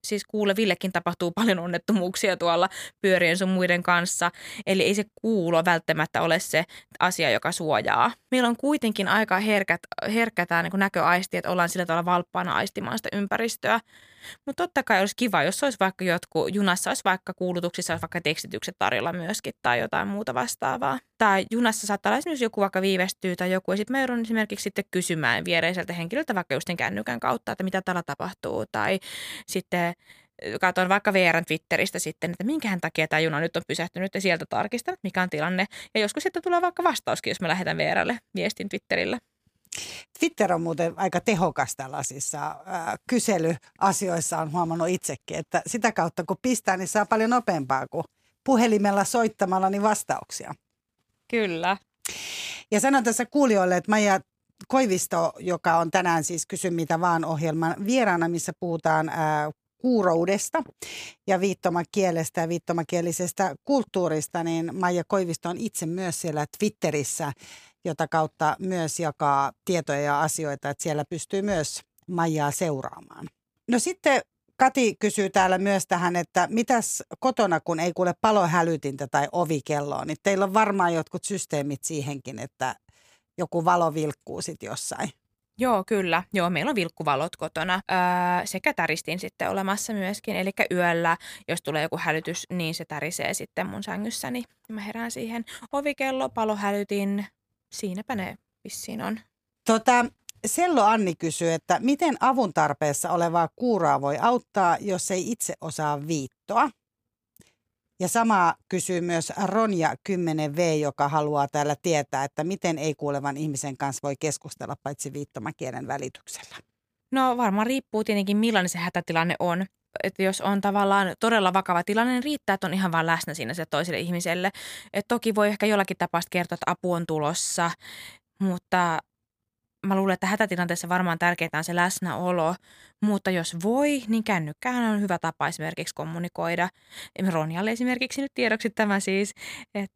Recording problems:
none

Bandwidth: 15 kHz